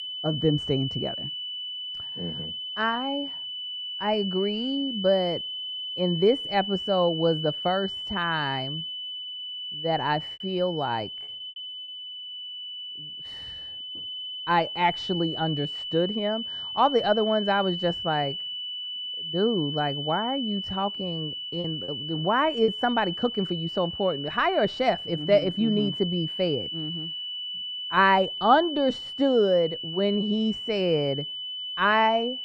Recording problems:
muffled; very; fading above 4 kHz
high-pitched whine; loud; throughout; 3 kHz, 6 dB below the speech
choppy; very; at 10 s and from 21 to 23 s; 9% of the speech affected

